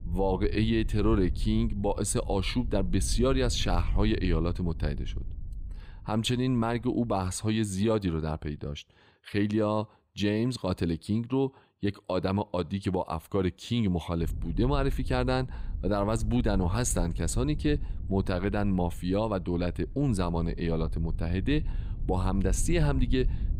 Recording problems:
wind noise on the microphone; occasional gusts; until 7.5 s and from 14 s on; 20 dB below the speech

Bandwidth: 15.5 kHz